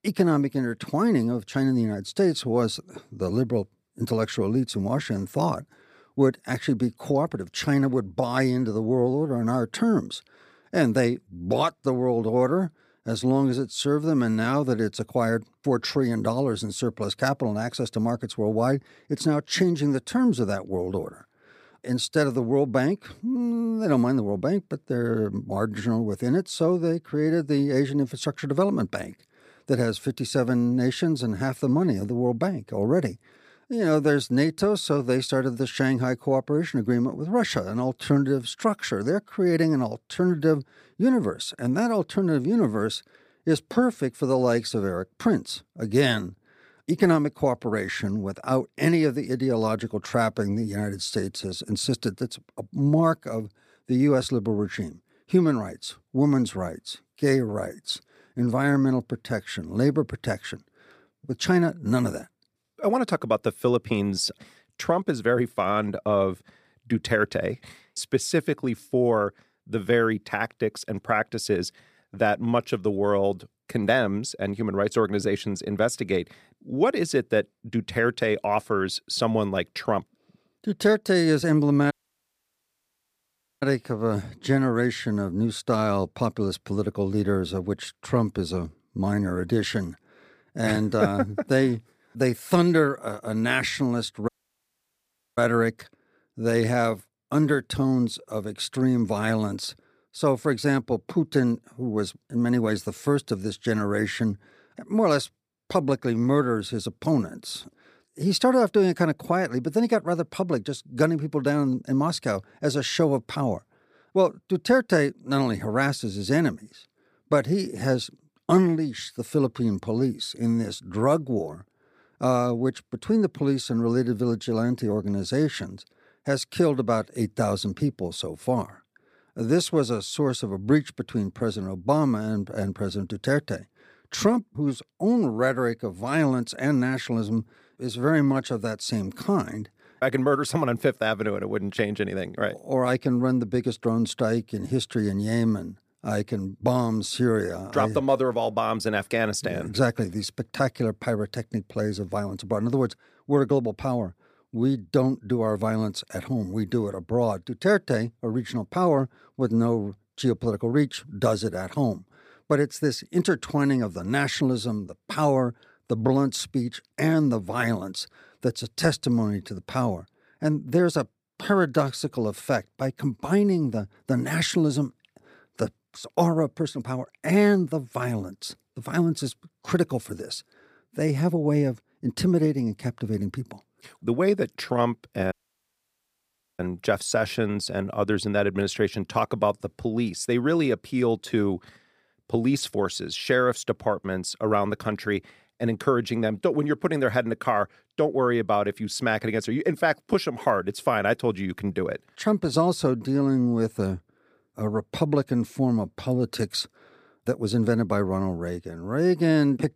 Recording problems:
audio cutting out; at 1:22 for 1.5 s, at 1:34 for 1 s and at 3:05 for 1.5 s

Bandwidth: 15 kHz